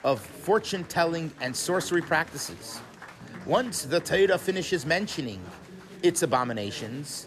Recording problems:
chatter from many people; noticeable; throughout; 15 dB below the speech

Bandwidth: 14 kHz